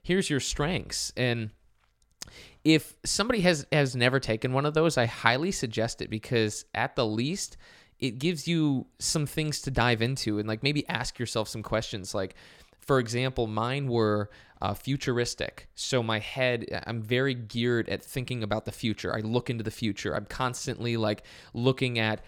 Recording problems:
none

